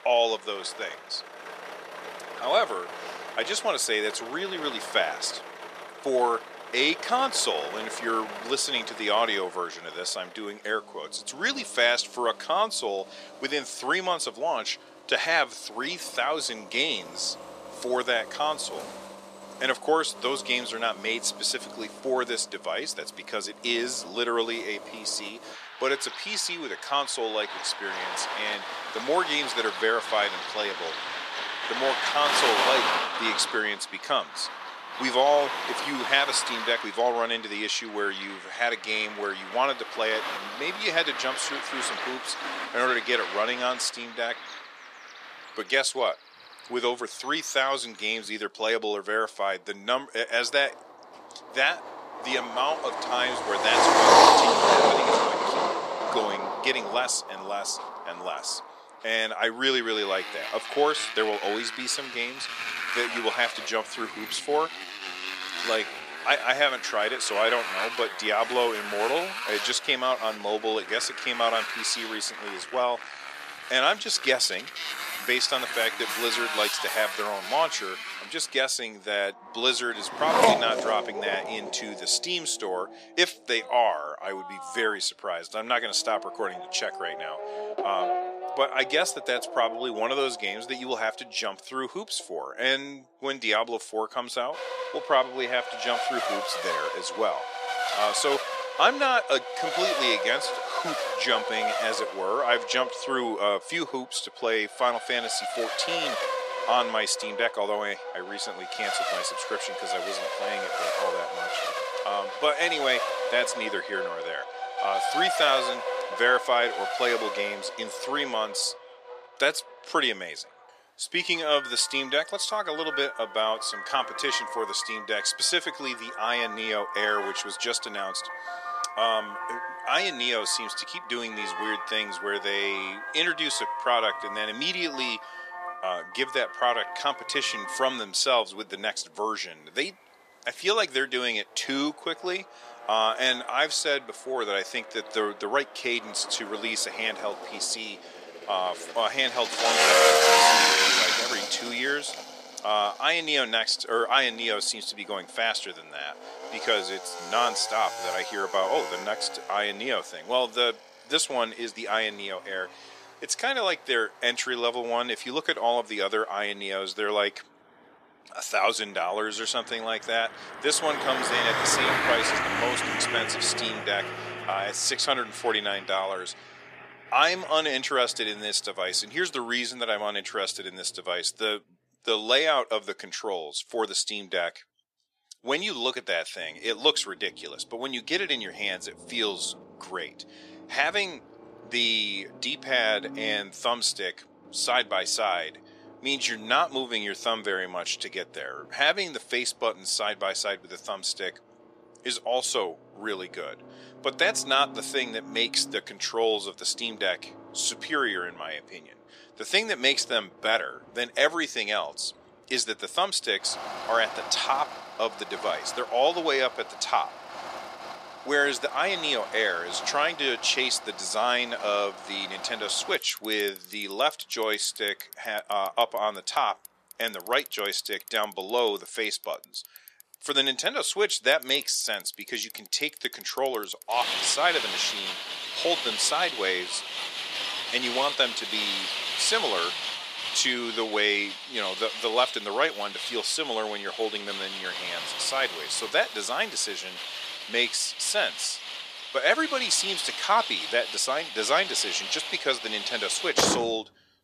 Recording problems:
thin; somewhat; fading below 600 Hz
traffic noise; loud; throughout; 3 dB below the speech

